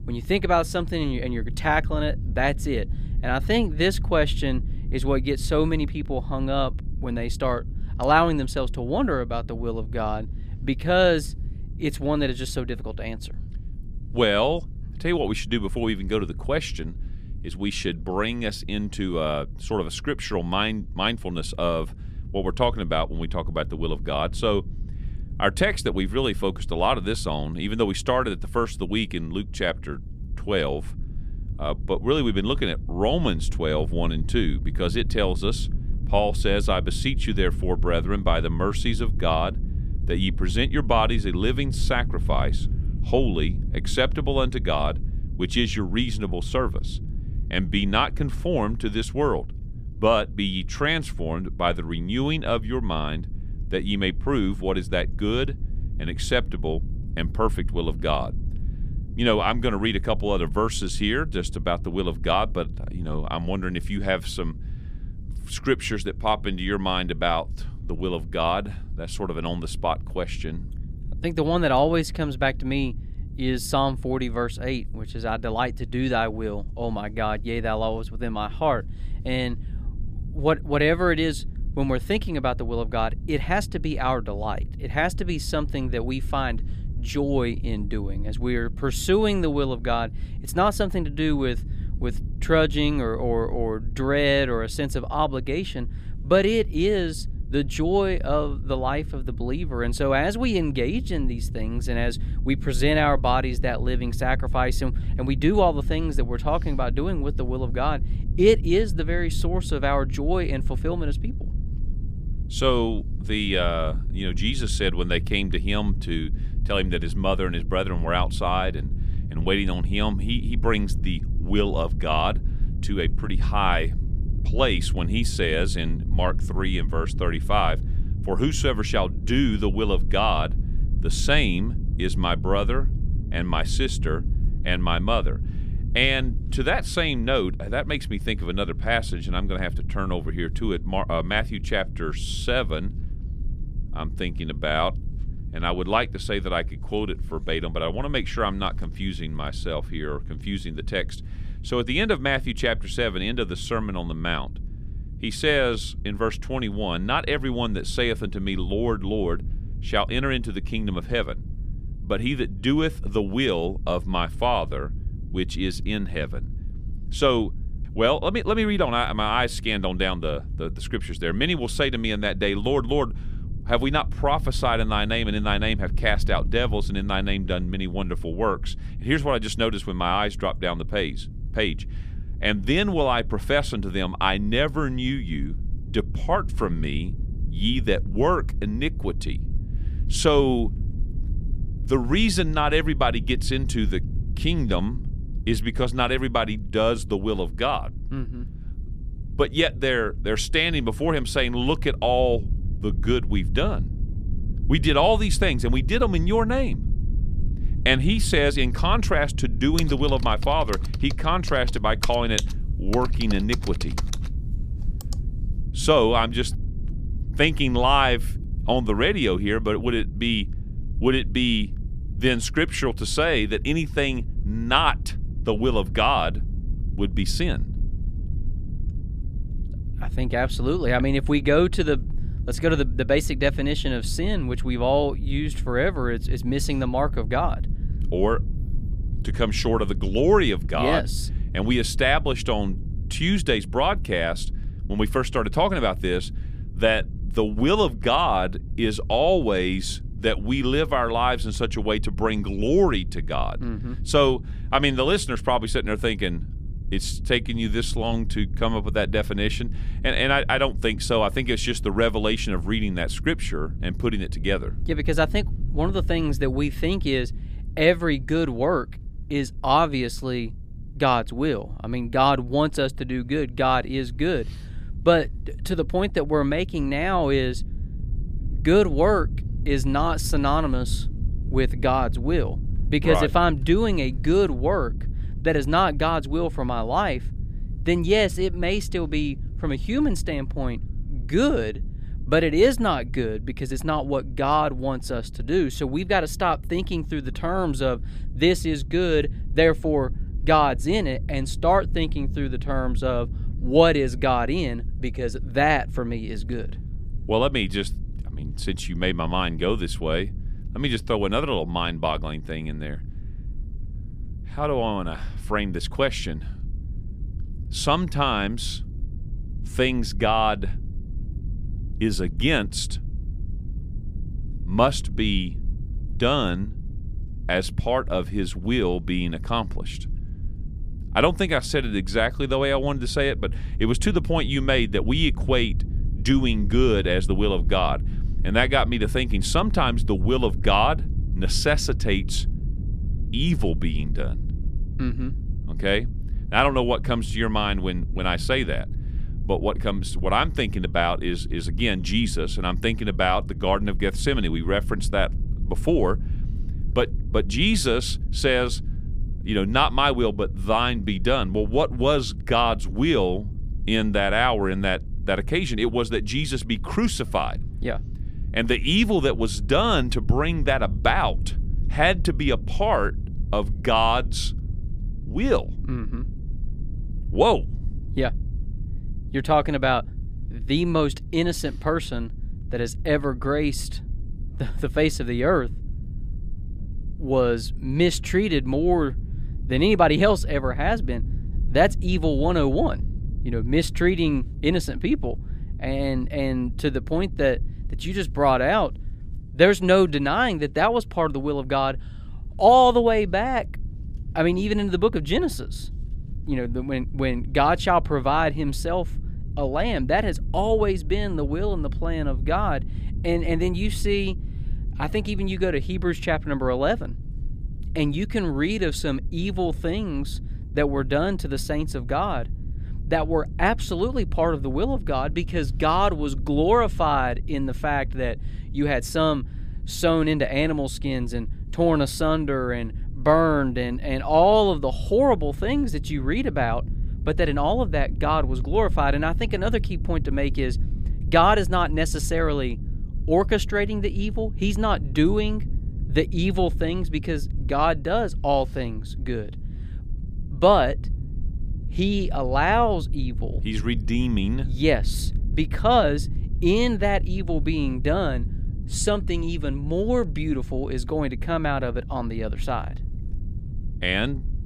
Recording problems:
low rumble; faint; throughout; 20 dB below the speech
keyboard typing; noticeable; from 3:30 to 3:35; peak 3 dB below the speech

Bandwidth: 15 kHz